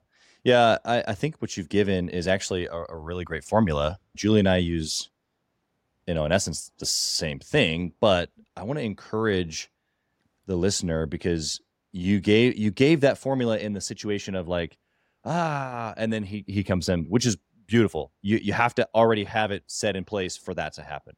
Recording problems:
none

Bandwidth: 16.5 kHz